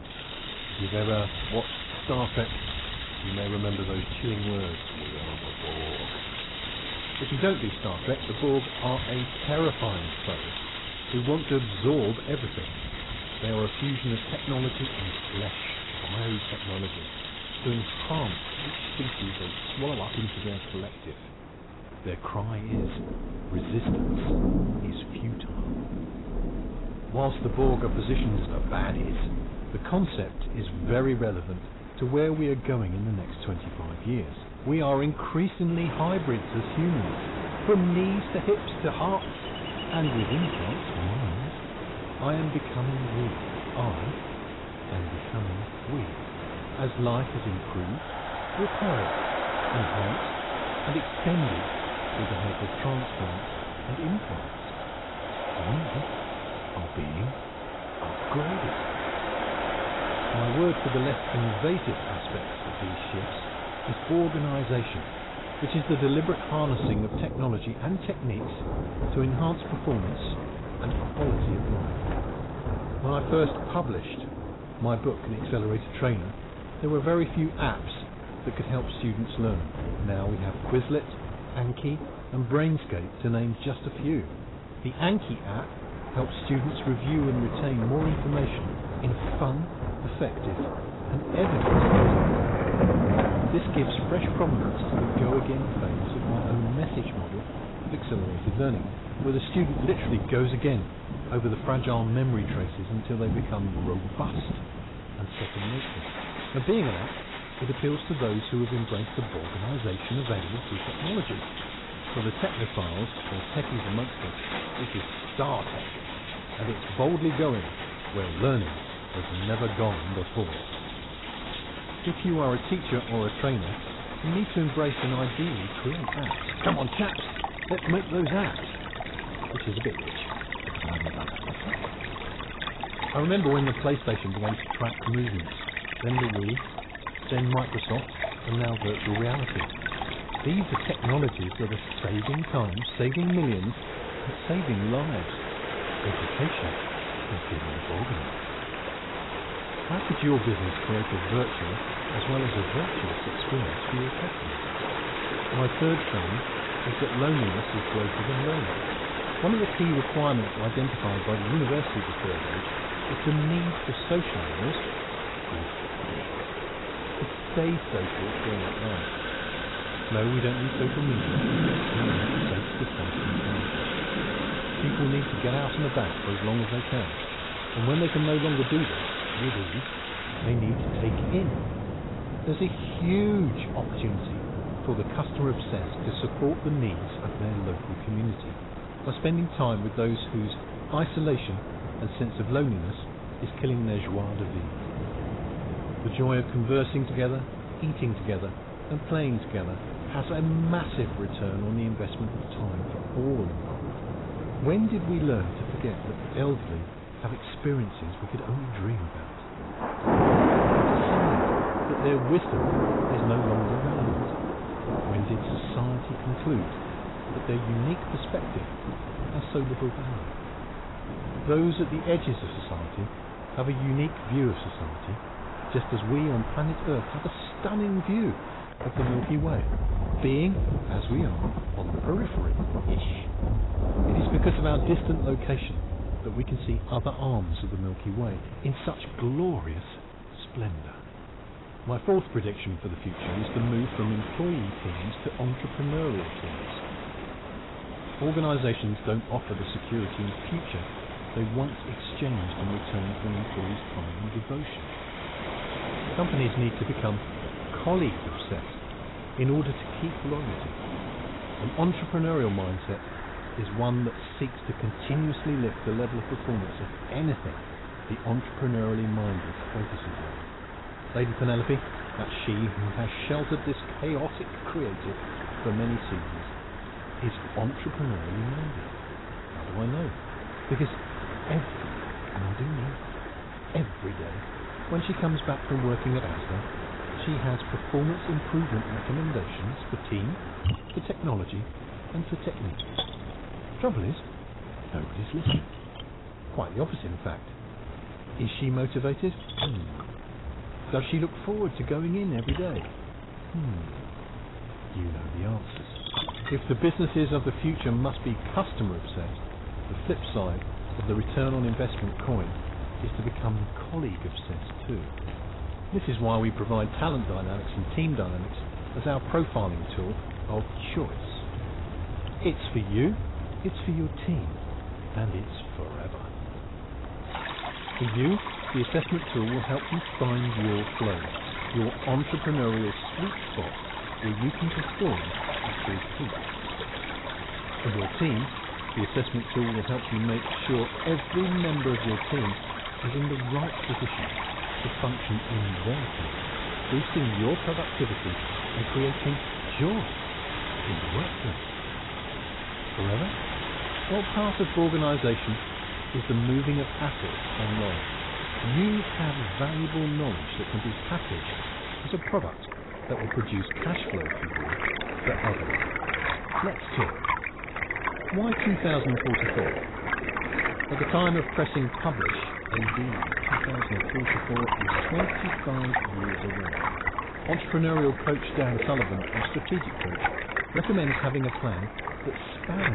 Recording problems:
garbled, watery; badly; nothing above 4 kHz
distortion; slight; 10 dB below the speech
rain or running water; loud; throughout; 3 dB below the speech
wind noise on the microphone; occasional gusts; 10 dB below the speech
abrupt cut into speech; at the end

